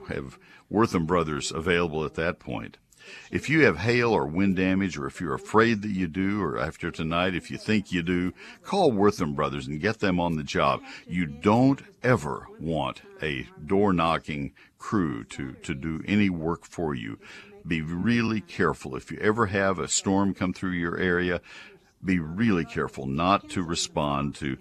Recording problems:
voice in the background; faint; throughout; 25 dB below the speech

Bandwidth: 13.5 kHz